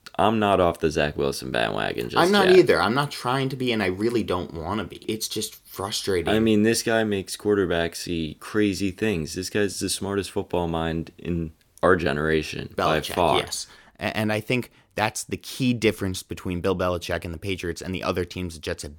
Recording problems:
none

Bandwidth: 17 kHz